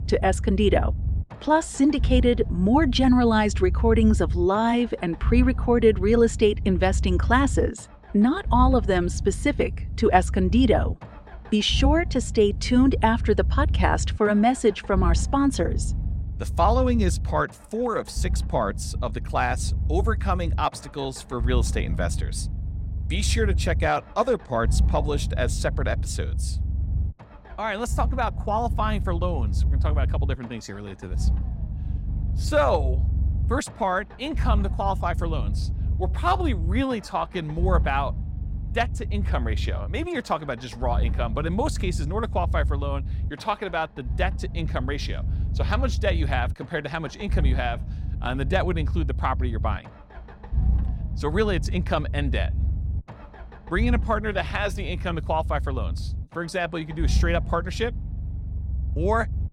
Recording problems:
low rumble; noticeable; throughout; 20 dB below the speech

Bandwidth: 16 kHz